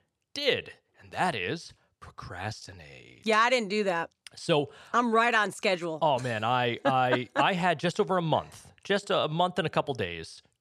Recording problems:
none

